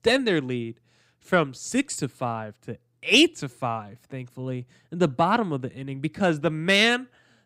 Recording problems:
none

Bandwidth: 15.5 kHz